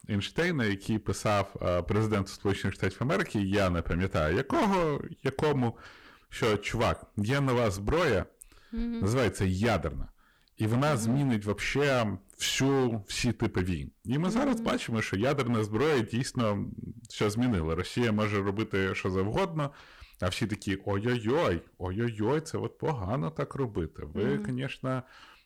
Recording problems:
distortion; heavy; 11% of the sound clipped

